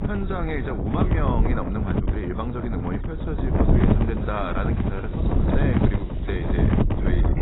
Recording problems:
garbled, watery; badly; nothing above 4 kHz
wind noise on the microphone; heavy; 1 dB above the speech
animal sounds; noticeable; from 3.5 s on; 15 dB below the speech

